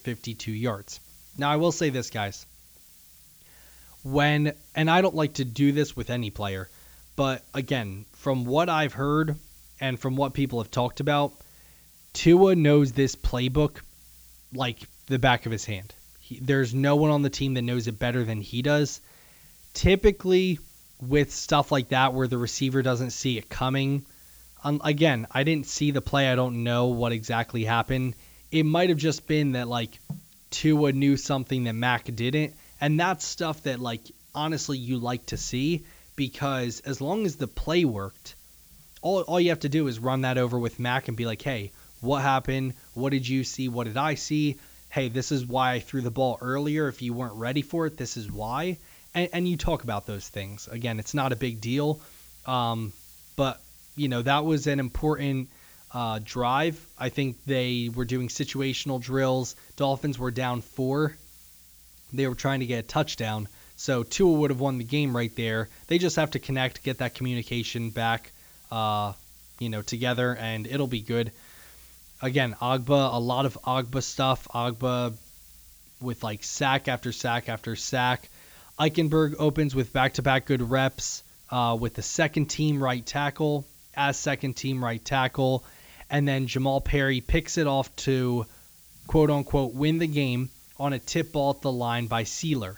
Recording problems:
high frequencies cut off; noticeable; nothing above 7.5 kHz
hiss; faint; throughout; 25 dB below the speech

